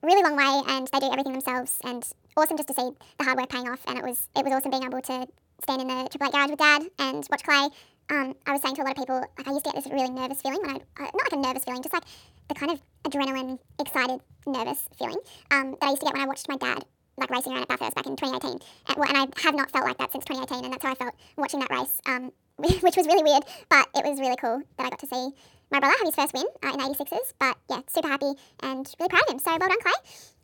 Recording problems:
wrong speed and pitch; too fast and too high; 1.6 times normal speed

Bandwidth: 17.5 kHz